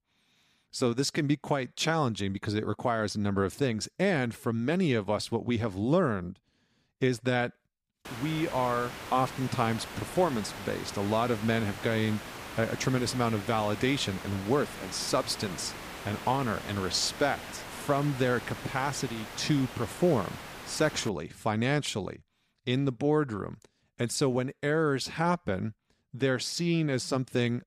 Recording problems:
hiss; noticeable; from 8 to 21 s; 10 dB below the speech

